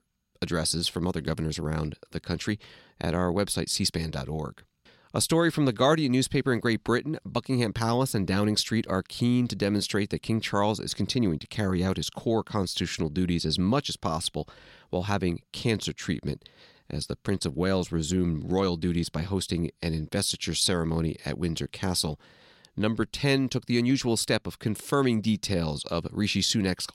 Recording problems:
none

